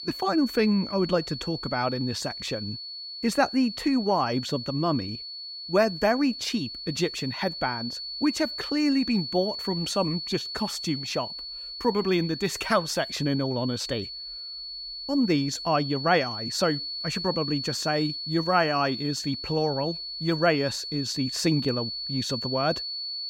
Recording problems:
high-pitched whine; loud; throughout; 4.5 kHz, 6 dB below the speech

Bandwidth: 16 kHz